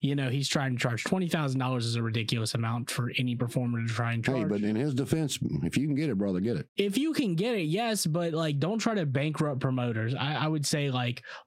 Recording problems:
squashed, flat; heavily

